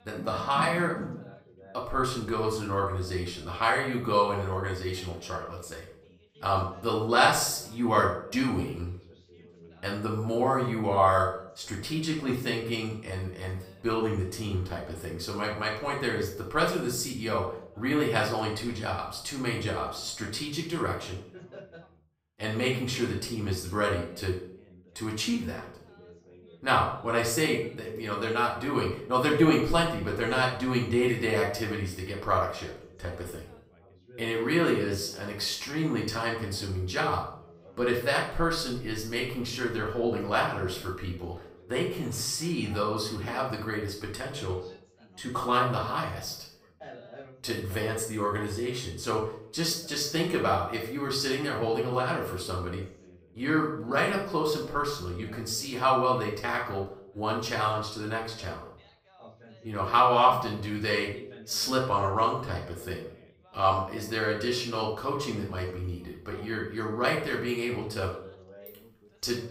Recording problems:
off-mic speech; far
room echo; noticeable; dies away in 0.5 s
background chatter; faint; throughout; 3 voices, 25 dB below the speech

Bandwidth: 15.5 kHz